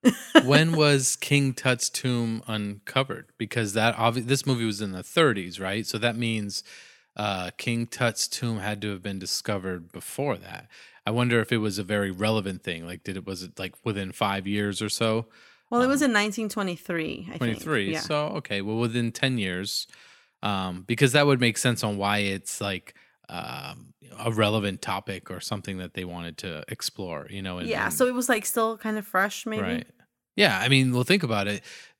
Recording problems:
none

